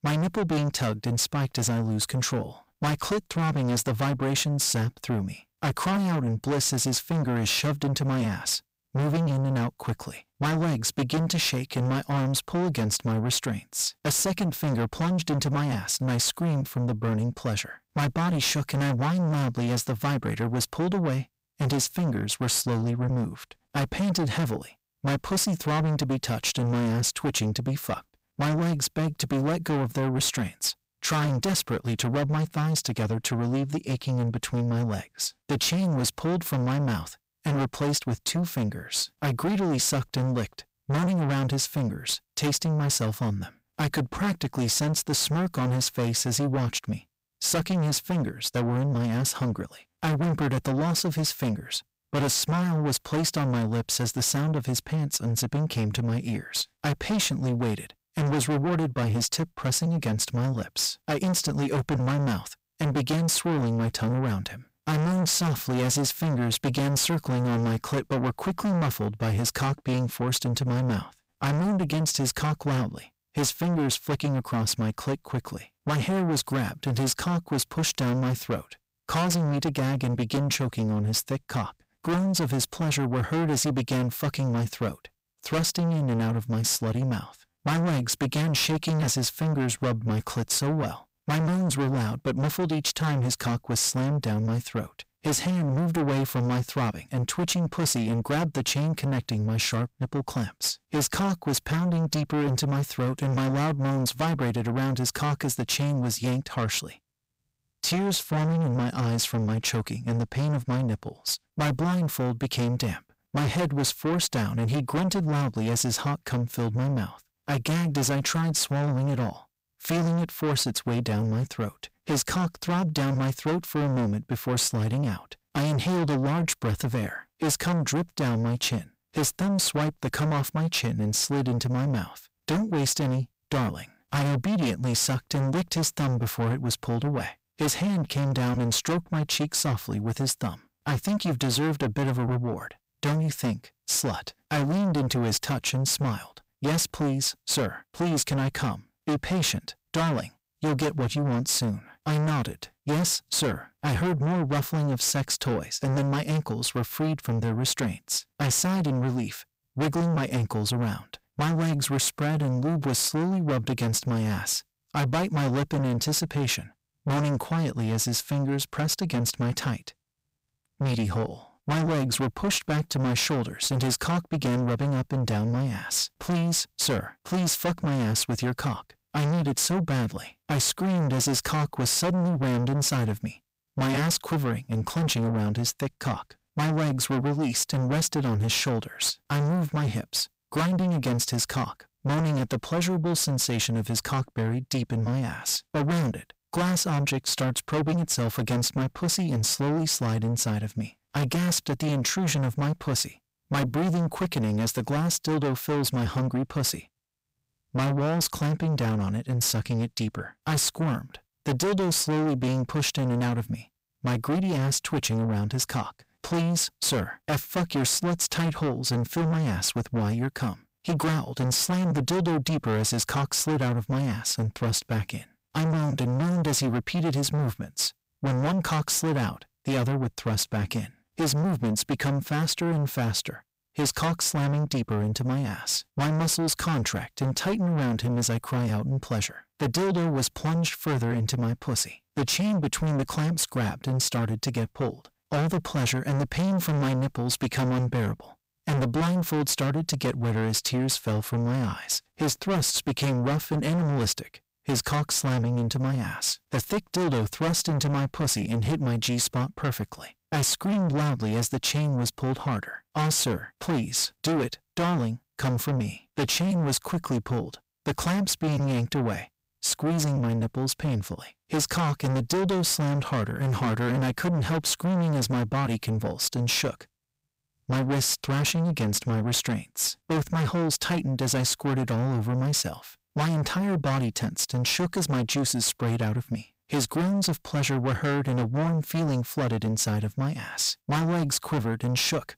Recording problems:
distortion; heavy; 6 dB below the speech

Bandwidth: 15.5 kHz